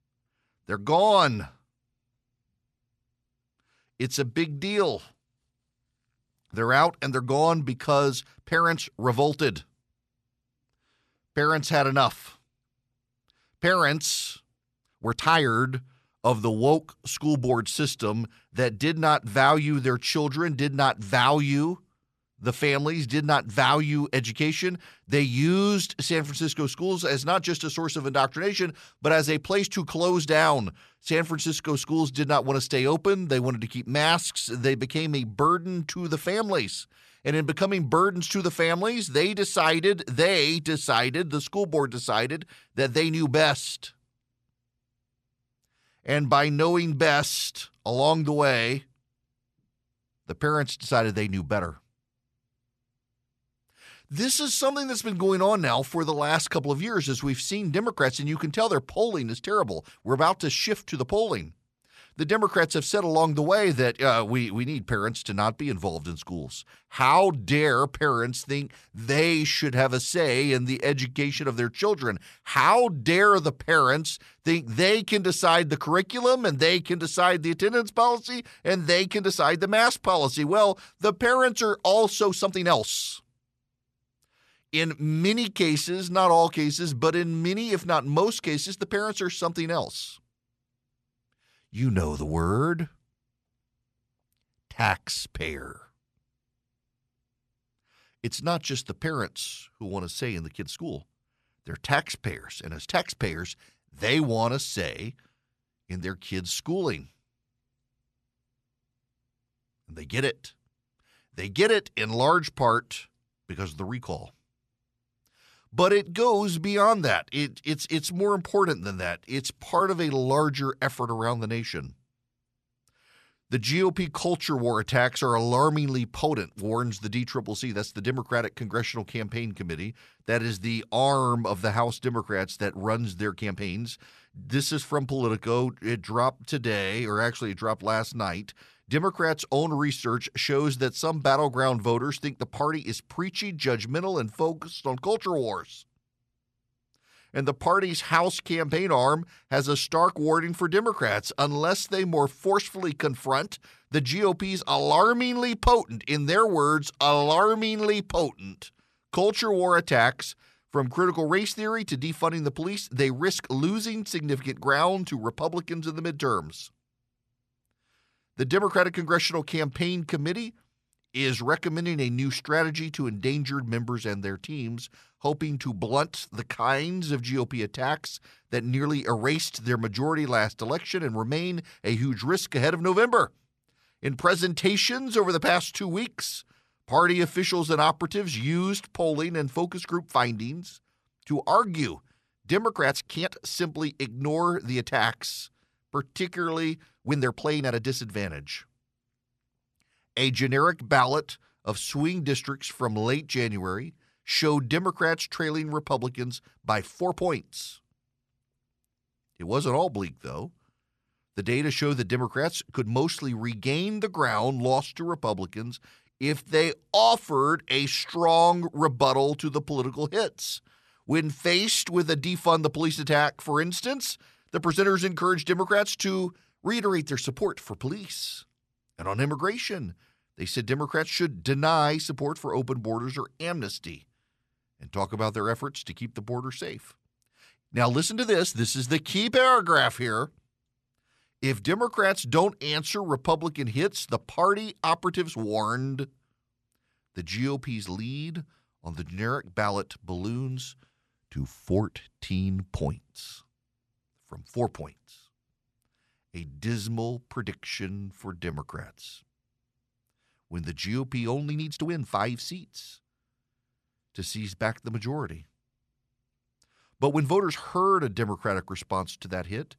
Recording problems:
uneven, jittery; strongly; from 15 s to 4:28

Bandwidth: 13.5 kHz